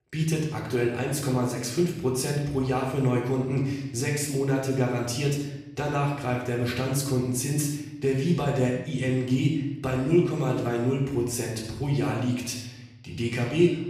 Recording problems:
off-mic speech; far
room echo; noticeable; dies away in 0.8 s

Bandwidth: 14.5 kHz